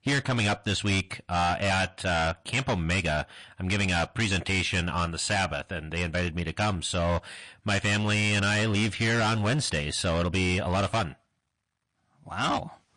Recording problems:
distortion; heavy; 17% of the sound clipped
garbled, watery; slightly; nothing above 8 kHz

